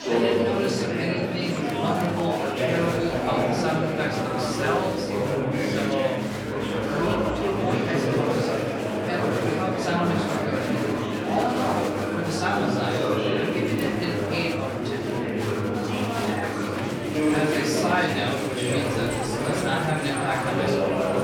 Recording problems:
off-mic speech; far
room echo; noticeable; dies away in 0.8 s
chatter from many people; very loud; throughout; 3 dB above the speech
background music; very faint; throughout; 30 dB below the speech

